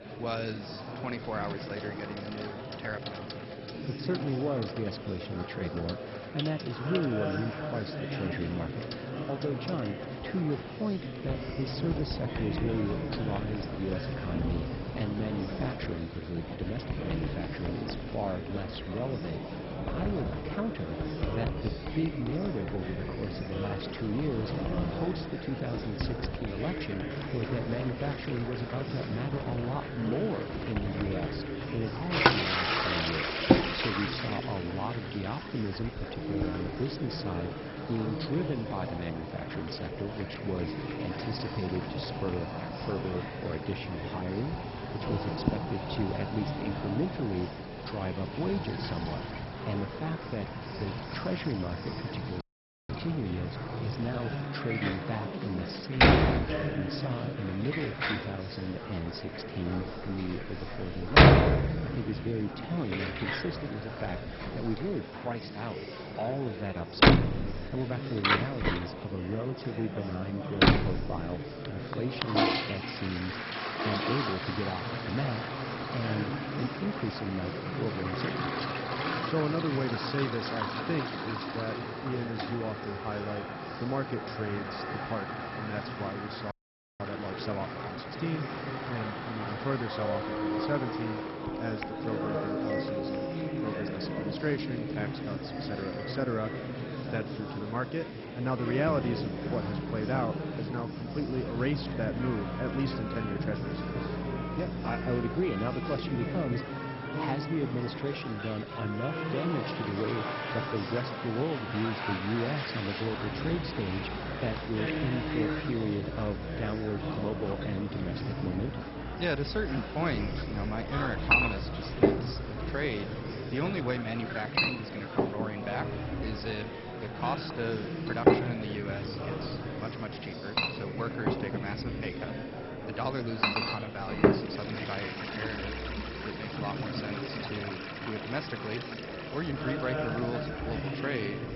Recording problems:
garbled, watery; badly; nothing above 5.5 kHz
household noises; very loud; throughout; 2 dB above the speech
background music; loud; throughout; 7 dB below the speech
murmuring crowd; loud; throughout; 3 dB below the speech
audio freezing; at 52 s and at 1:27

